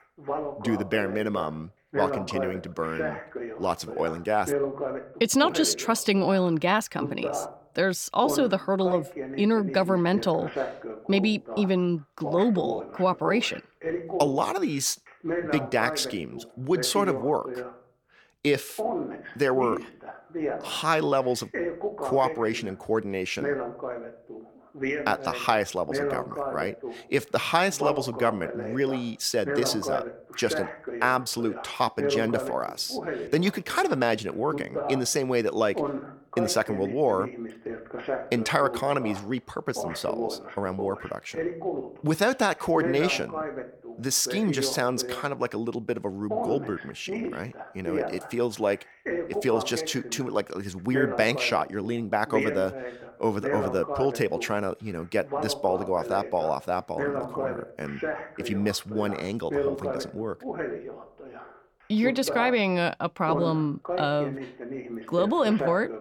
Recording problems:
voice in the background; loud; throughout; 7 dB below the speech

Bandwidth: 17.5 kHz